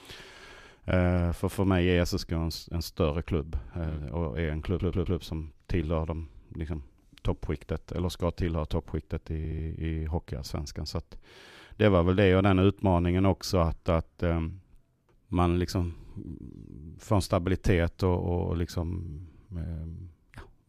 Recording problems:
audio stuttering; at 4.5 s and at 9.5 s

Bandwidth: 14.5 kHz